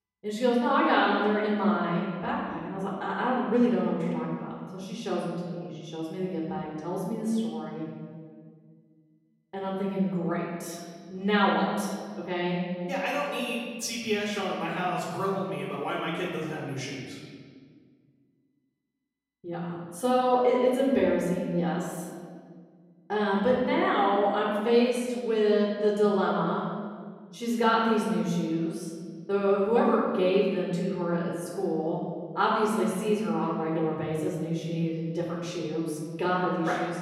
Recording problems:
off-mic speech; far
room echo; noticeable; dies away in 1.7 s

